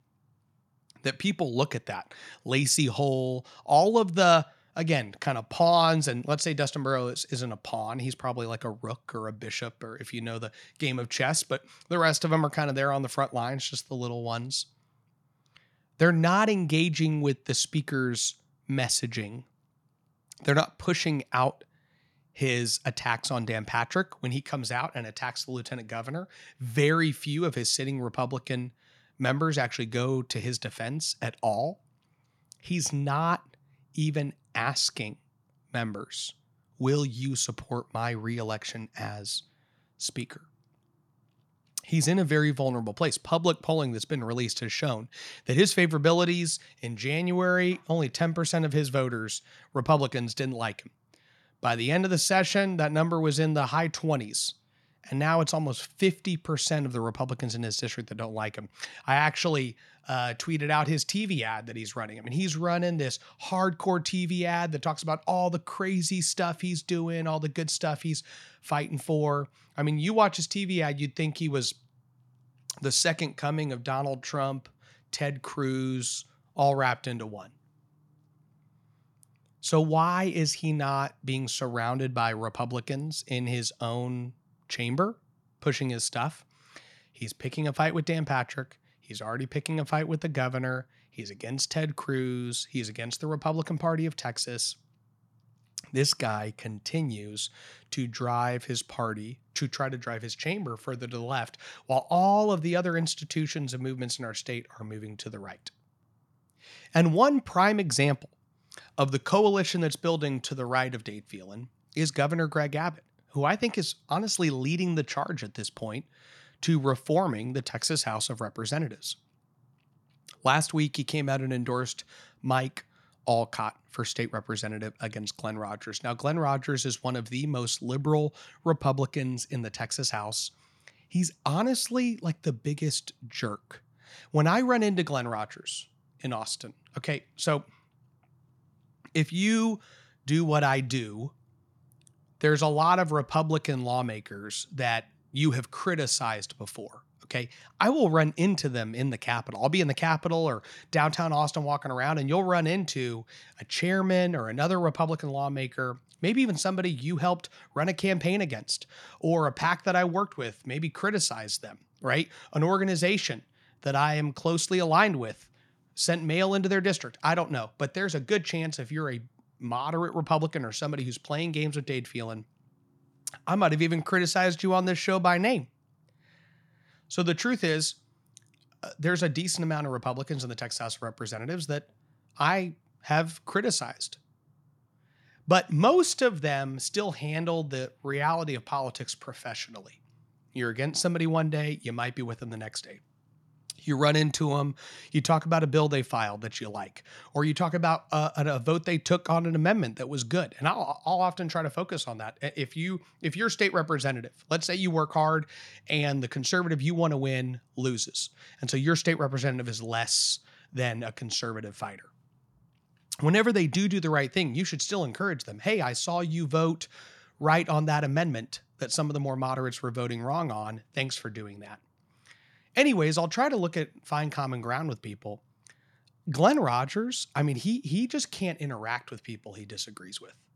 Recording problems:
none

